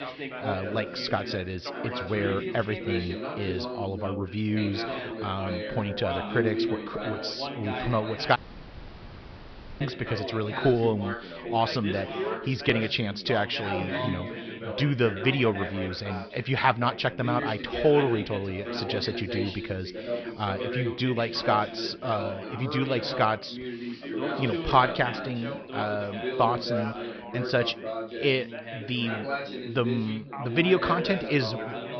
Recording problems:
high frequencies cut off; noticeable; nothing above 5.5 kHz
background chatter; loud; throughout; 4 voices, 5 dB below the speech
audio cutting out; at 8.5 s for 1.5 s

